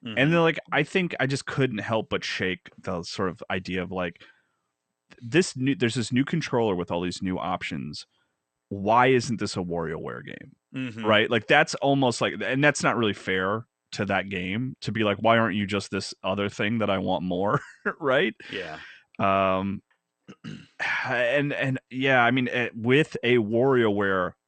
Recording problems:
garbled, watery; slightly; nothing above 8.5 kHz

